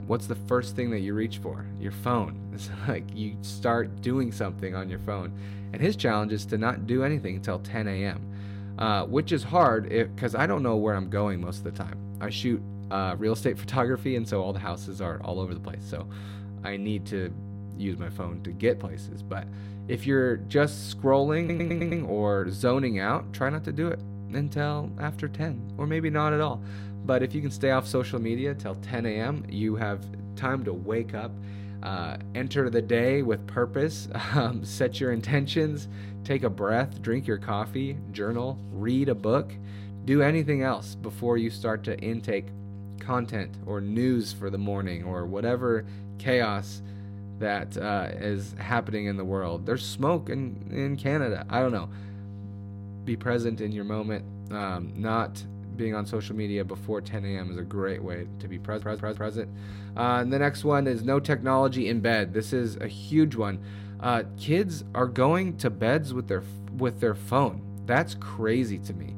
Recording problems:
electrical hum; noticeable; throughout; 50 Hz, 20 dB below the speech
audio stuttering; at 21 s and at 59 s

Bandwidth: 16 kHz